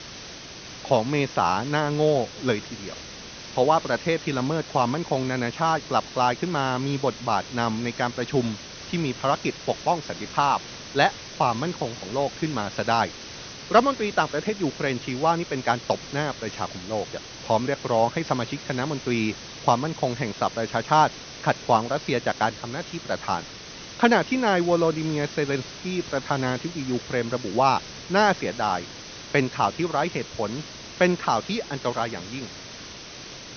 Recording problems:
high frequencies cut off; noticeable; nothing above 6 kHz
hiss; noticeable; throughout; 15 dB below the speech

